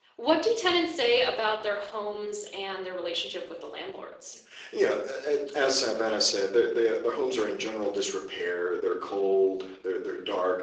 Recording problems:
thin; somewhat; fading below 350 Hz
room echo; slight; dies away in 0.5 s
off-mic speech; somewhat distant
garbled, watery; slightly

